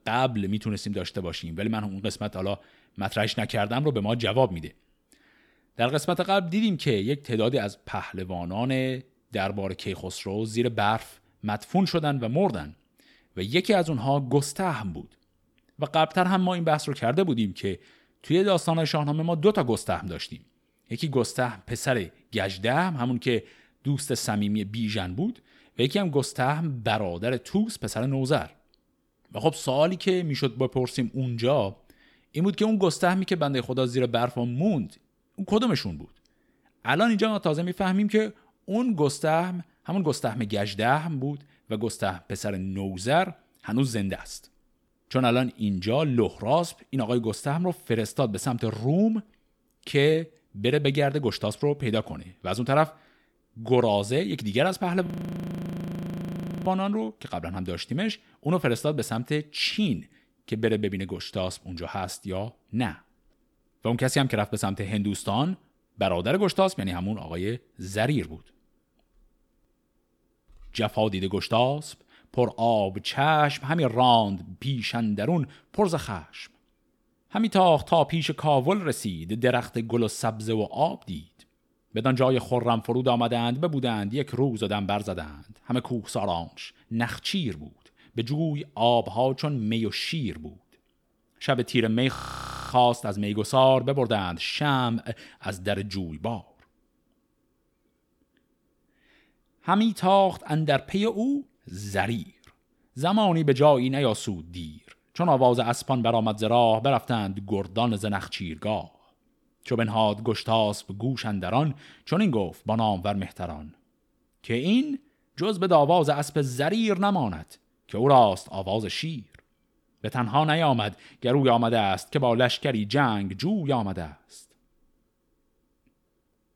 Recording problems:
audio freezing; at 55 s for 1.5 s and at 1:32 for 0.5 s

